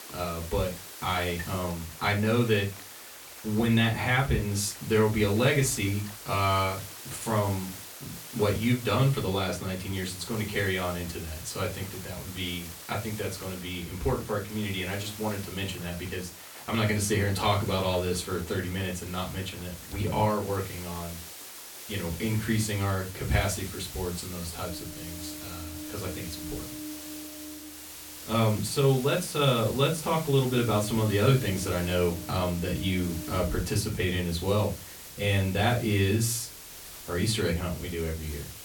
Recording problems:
off-mic speech; far
room echo; very slight; dies away in 0.2 s
hiss; noticeable; throughout; 15 dB below the speech
rain or running water; faint; throughout; 20 dB below the speech

